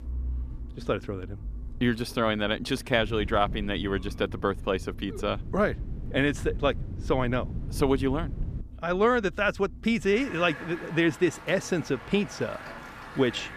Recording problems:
traffic noise; noticeable; throughout; 15 dB below the speech
wind noise on the microphone; occasional gusts; from 3 to 8.5 s; 20 dB below the speech

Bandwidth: 14.5 kHz